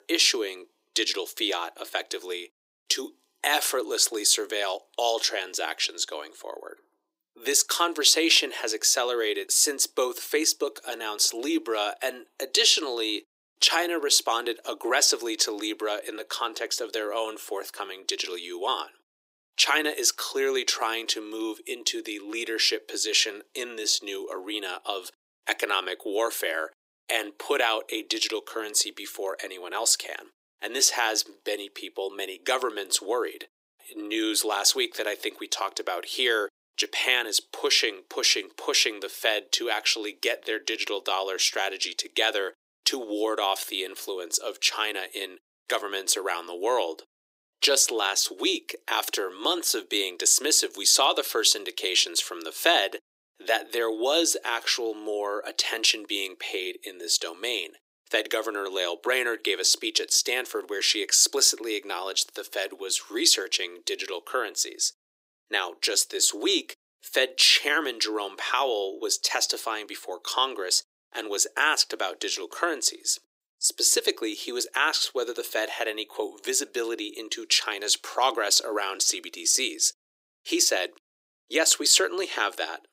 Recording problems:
thin; very; fading below 300 Hz

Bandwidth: 15.5 kHz